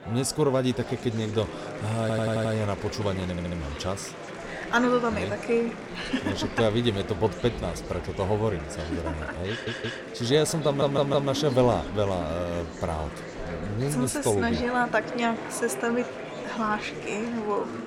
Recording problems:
murmuring crowd; loud; throughout; 9 dB below the speech
audio stuttering; 4 times, first at 2 s

